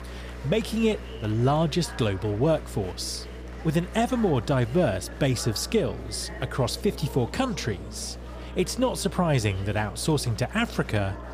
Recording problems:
chatter from many people; noticeable; throughout; 15 dB below the speech
electrical hum; faint; throughout; 60 Hz, 20 dB below the speech

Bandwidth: 15 kHz